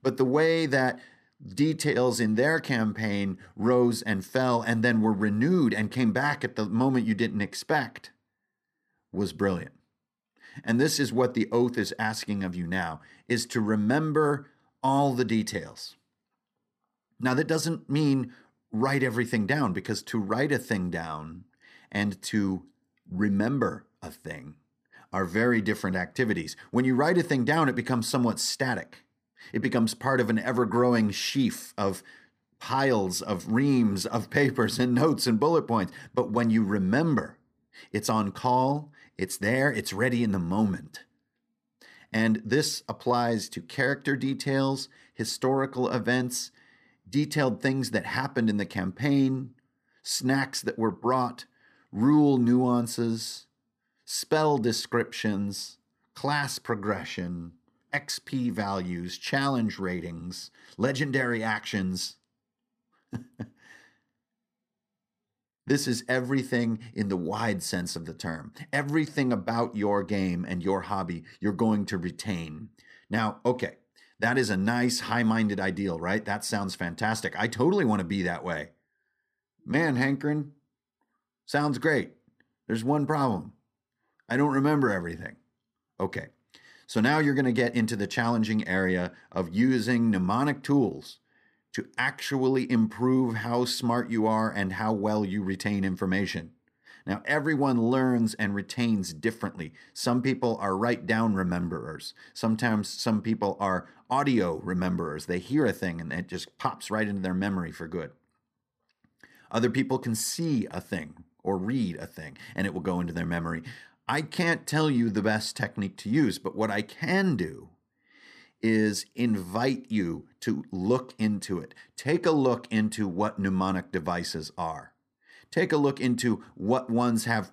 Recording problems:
none

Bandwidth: 15 kHz